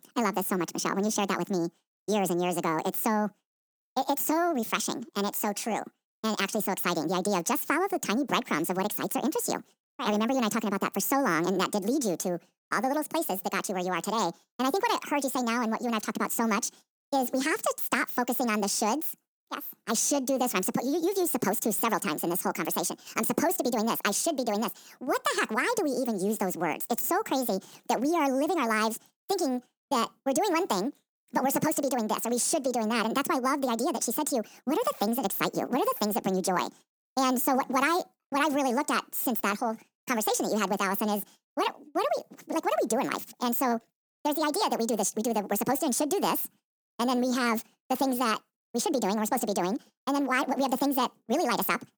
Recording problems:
wrong speed and pitch; too fast and too high; 1.6 times normal speed

